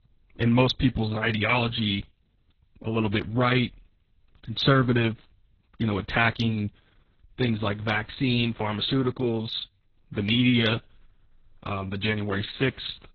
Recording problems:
garbled, watery; badly; nothing above 6 kHz

